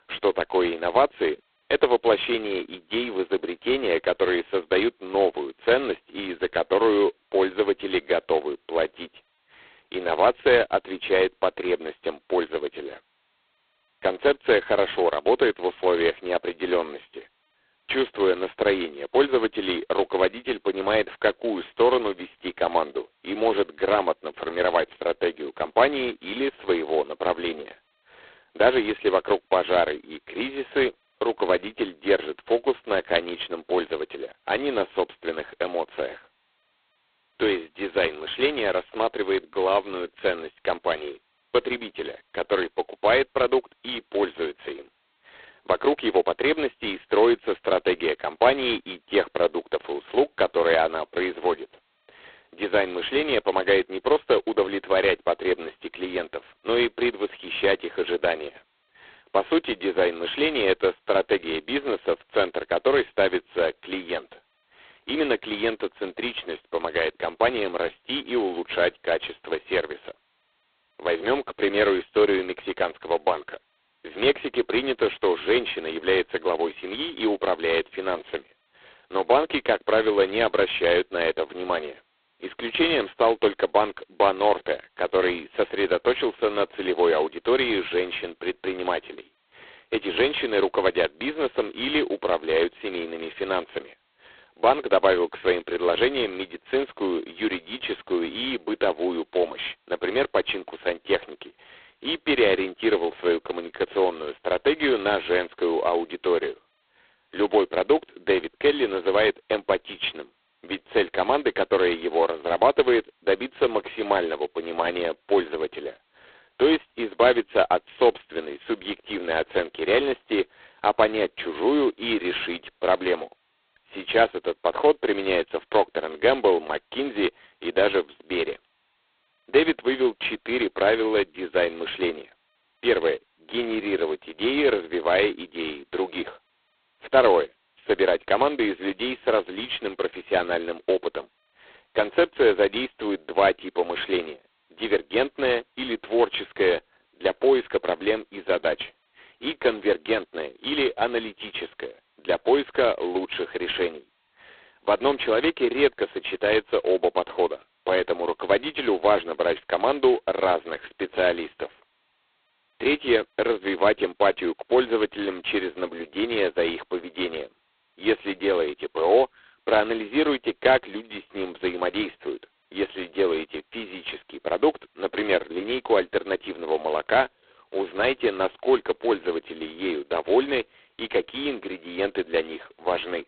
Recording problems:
phone-call audio; poor line; nothing above 4 kHz

